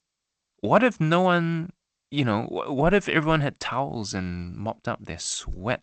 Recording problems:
garbled, watery; slightly; nothing above 8 kHz

